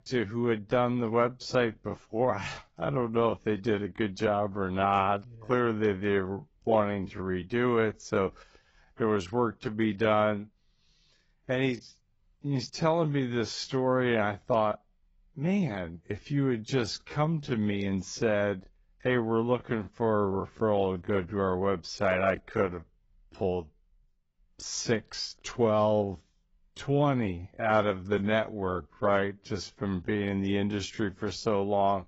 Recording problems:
garbled, watery; badly; nothing above 7.5 kHz
wrong speed, natural pitch; too slow; 0.6 times normal speed

